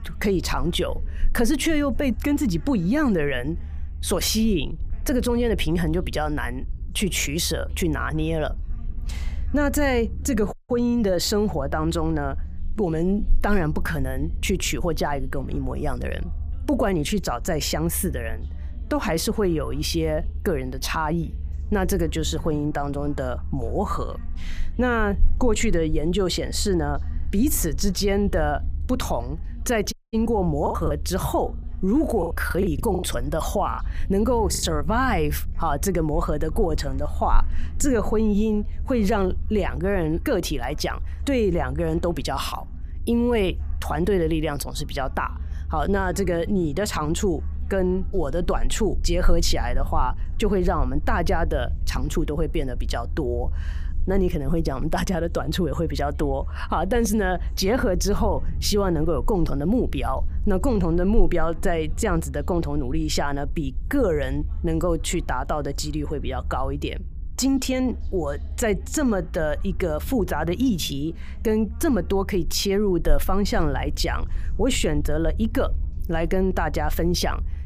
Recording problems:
voice in the background; faint; throughout; 30 dB below the speech
low rumble; faint; throughout; 25 dB below the speech
audio cutting out; at 11 s and at 30 s
choppy; very; from 31 to 35 s; 13% of the speech affected

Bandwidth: 15 kHz